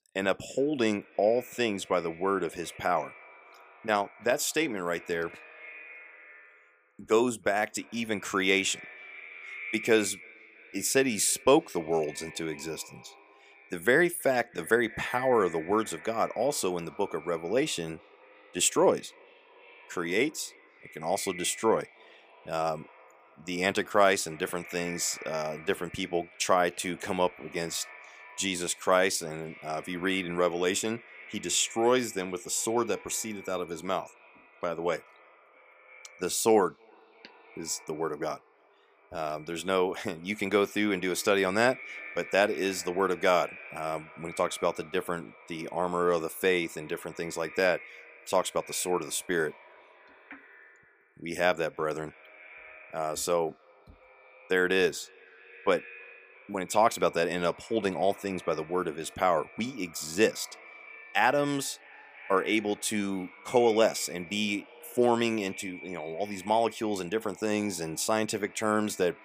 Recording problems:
echo of what is said; faint; throughout; 320 ms later, 20 dB below the speech

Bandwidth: 15 kHz